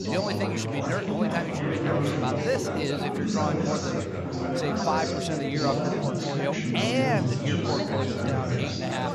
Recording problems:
chatter from many people; very loud; throughout; 3 dB above the speech
dog barking; noticeable; from 4.5 to 6 s; peak 6 dB below the speech

